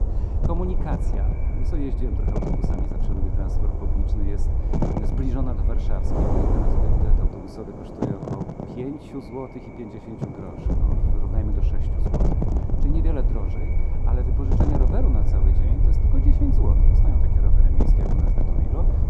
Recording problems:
muffled; very; fading above 1 kHz
echo of what is said; noticeable; throughout; 140 ms later, 15 dB below the speech
wind noise on the microphone; heavy; 2 dB above the speech
low rumble; loud; until 7.5 s and from 11 s on; 5 dB below the speech

